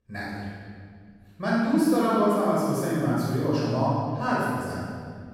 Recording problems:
room echo; strong; dies away in 2 s
off-mic speech; far

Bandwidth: 16.5 kHz